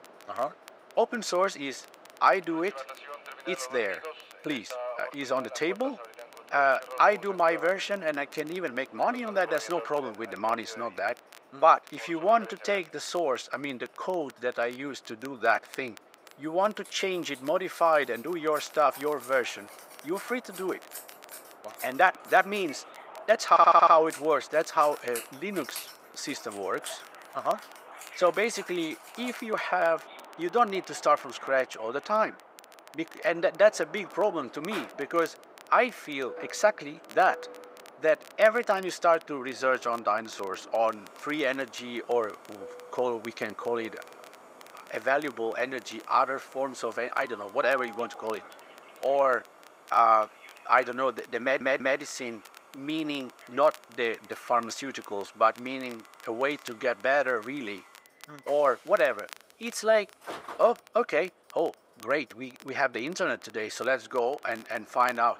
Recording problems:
thin; very; fading below 450 Hz
train or aircraft noise; noticeable; throughout; 20 dB below the speech
household noises; faint; throughout; 20 dB below the speech
crackle, like an old record; faint; 25 dB below the speech
audio stuttering; at 23 s and at 51 s

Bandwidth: 15.5 kHz